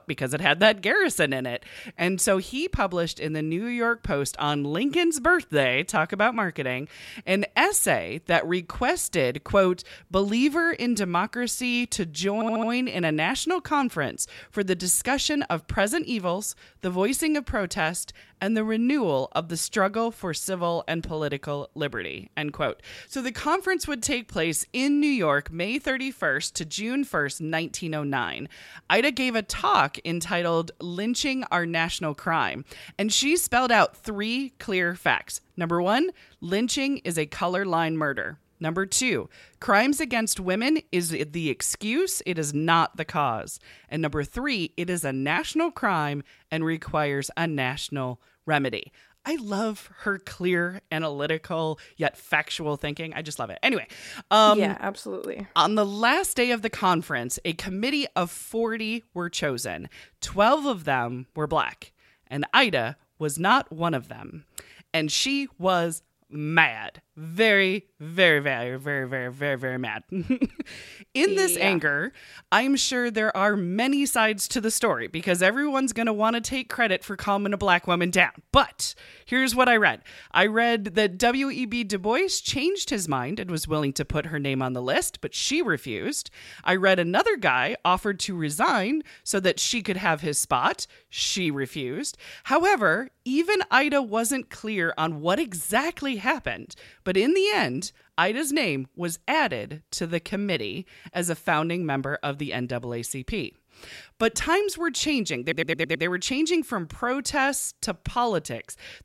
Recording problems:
audio stuttering; at 12 s and at 1:45

